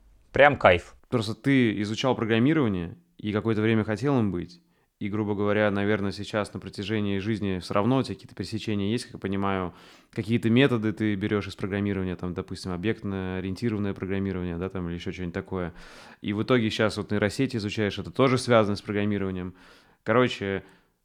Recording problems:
none

